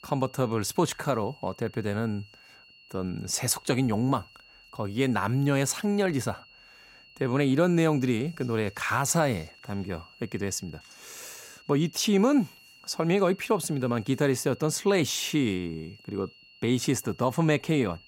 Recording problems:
high-pitched whine; faint; throughout; 3 kHz, 25 dB below the speech

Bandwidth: 16 kHz